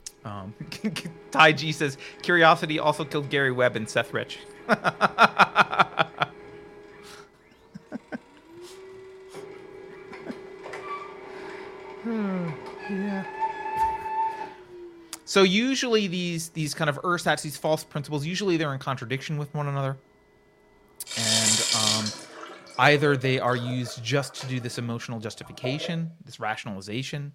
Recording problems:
household noises; loud; throughout; 5 dB below the speech

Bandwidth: 16 kHz